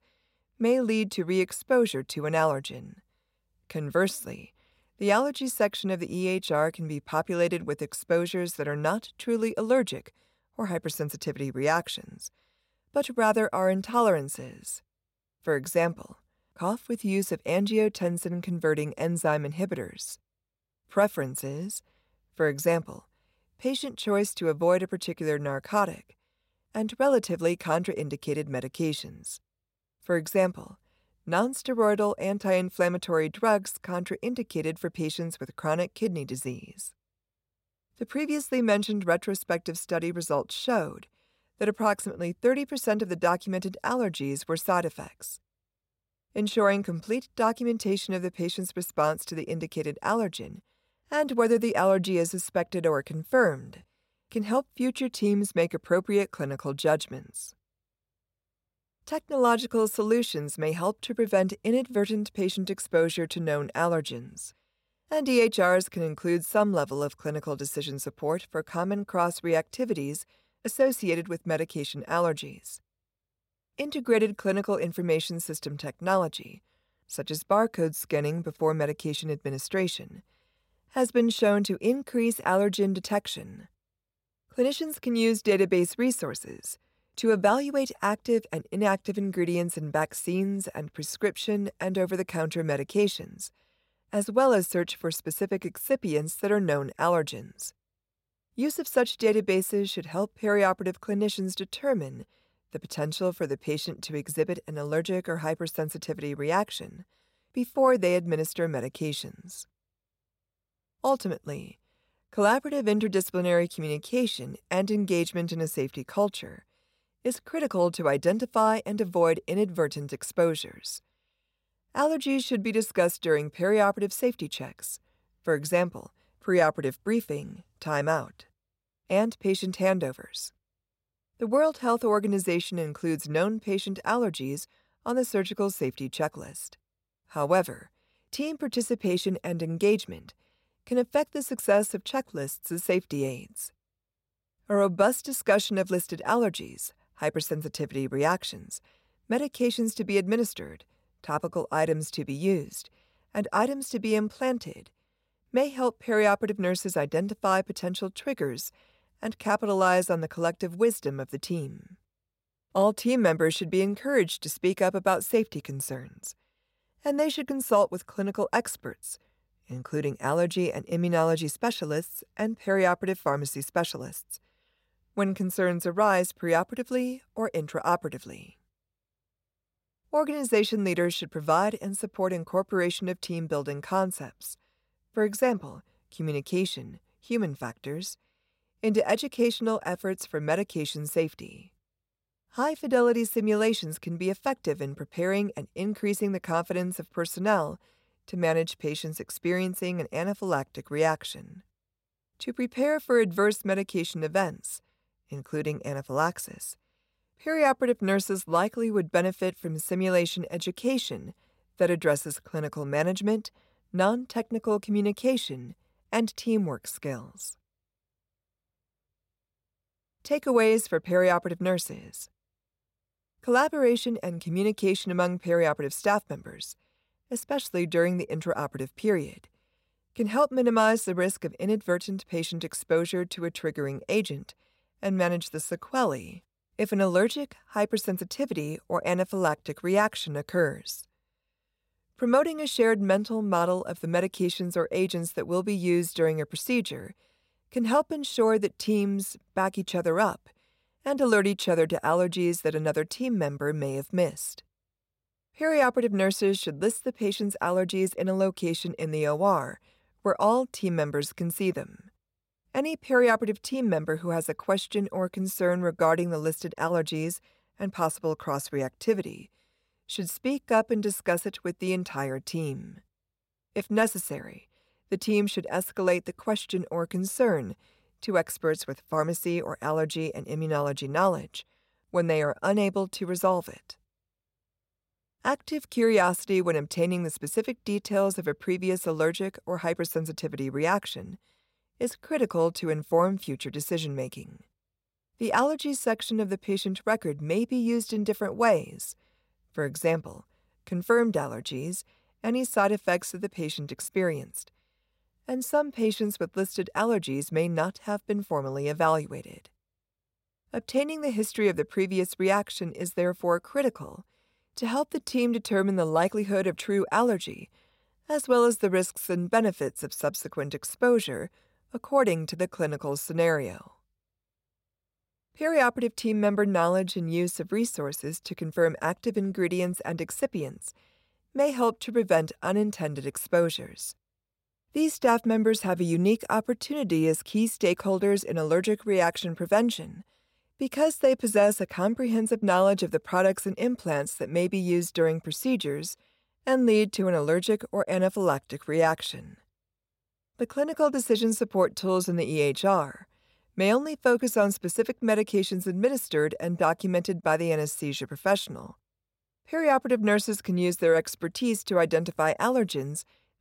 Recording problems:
none

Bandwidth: 16 kHz